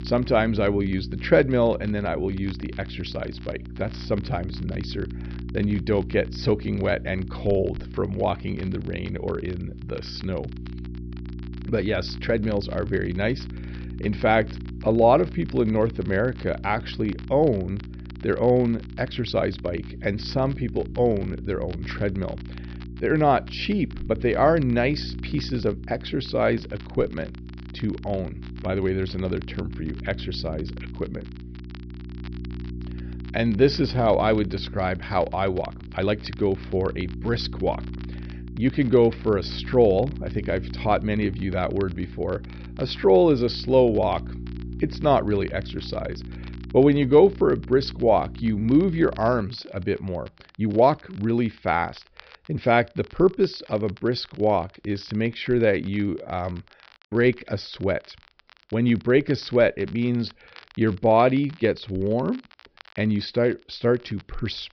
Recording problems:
high frequencies cut off; noticeable; nothing above 5.5 kHz
electrical hum; faint; until 49 s; 60 Hz, 20 dB below the speech
crackle, like an old record; faint; 25 dB below the speech
uneven, jittery; strongly; from 19 to 57 s

